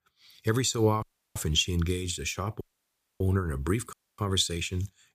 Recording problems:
audio cutting out; at 1 s, at 2.5 s for 0.5 s and at 4 s

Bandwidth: 15 kHz